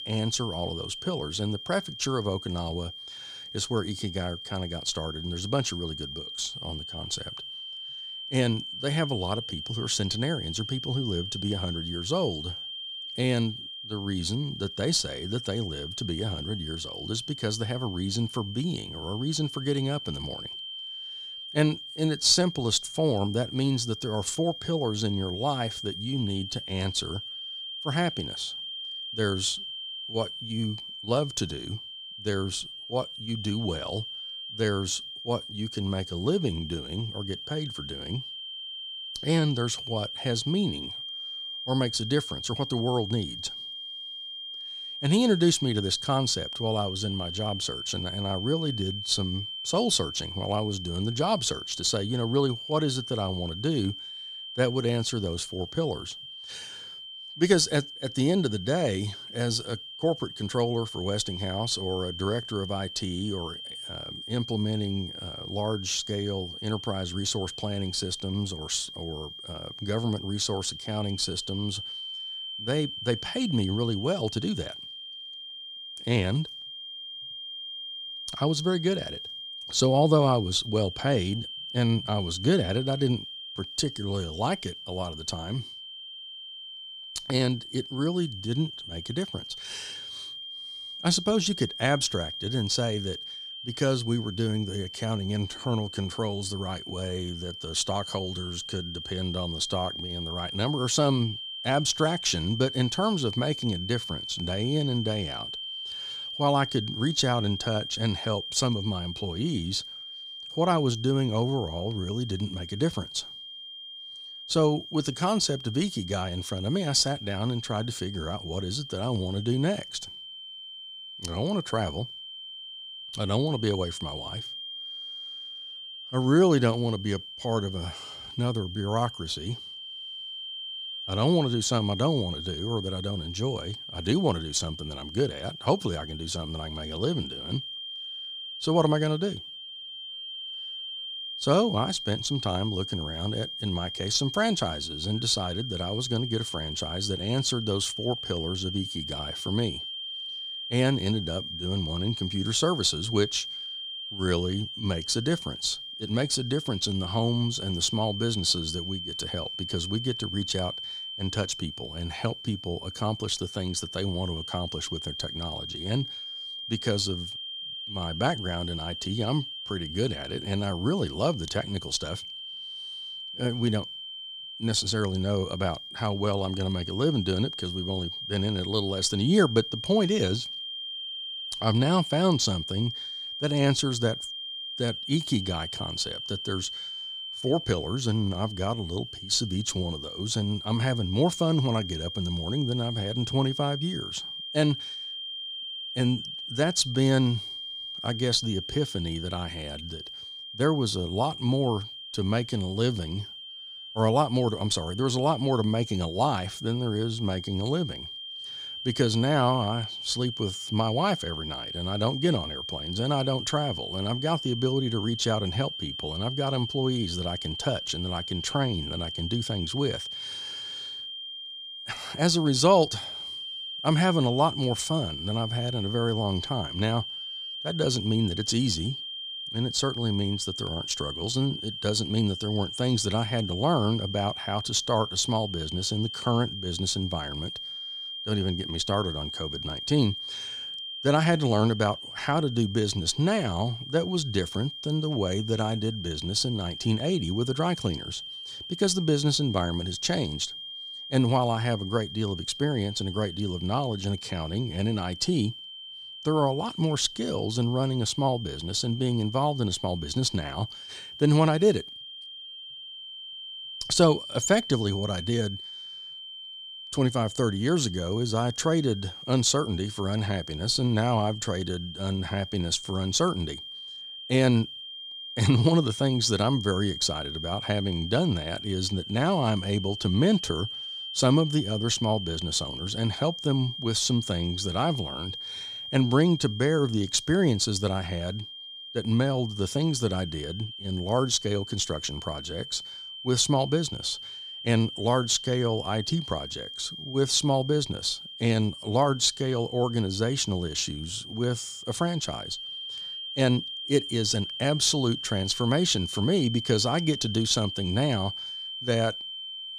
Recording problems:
high-pitched whine; loud; throughout; 3 kHz, 8 dB below the speech

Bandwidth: 15.5 kHz